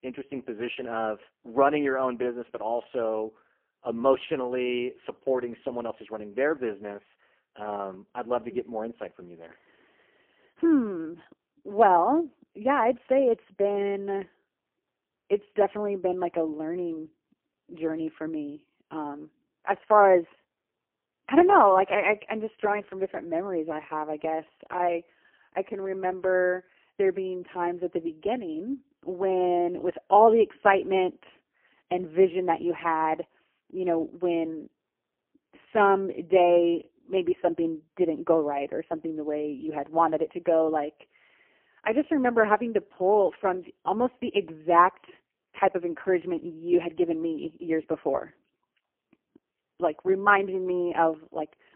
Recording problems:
phone-call audio; poor line; nothing above 3 kHz

